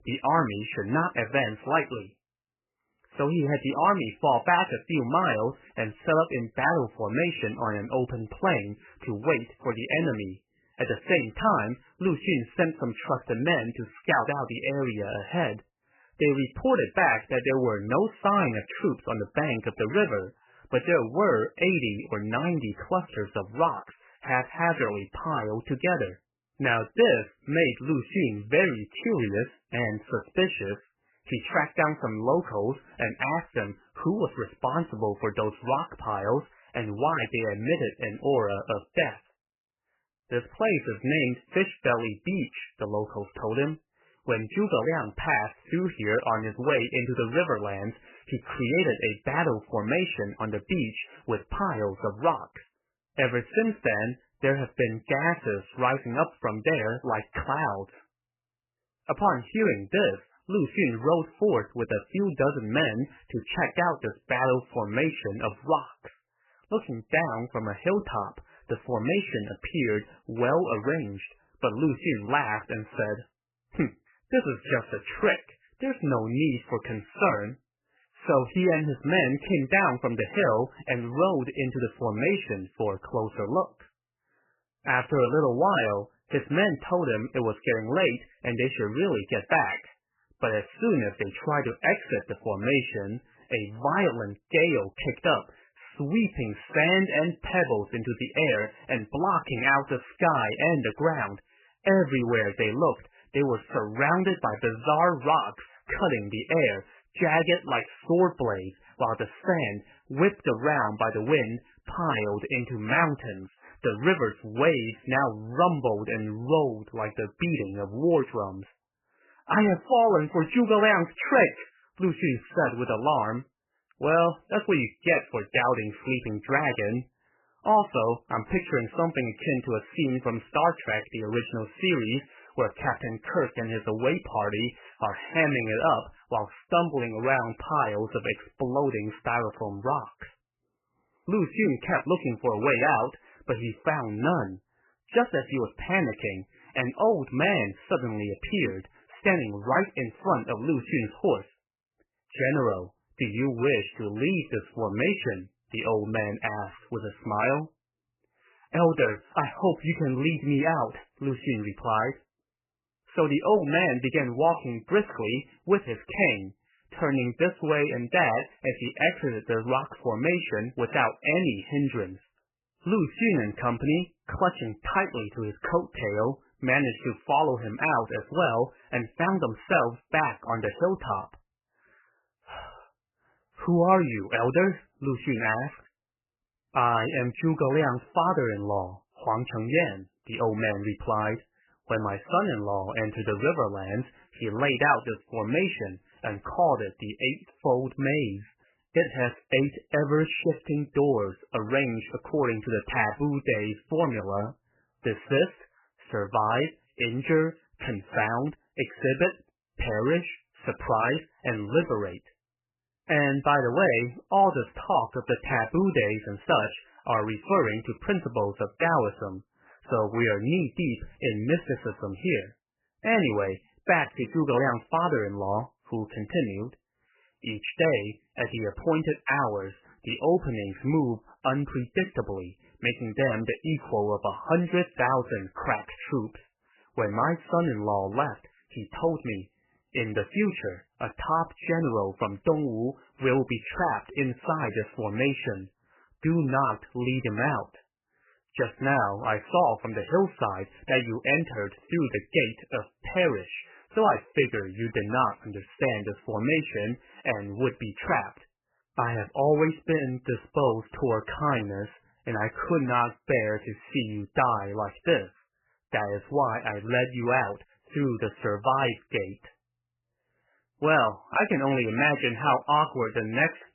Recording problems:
garbled, watery; badly; nothing above 3 kHz

